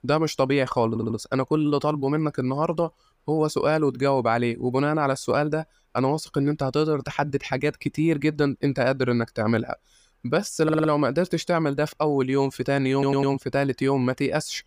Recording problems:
audio stuttering; at 1 s, at 11 s and at 13 s

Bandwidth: 15 kHz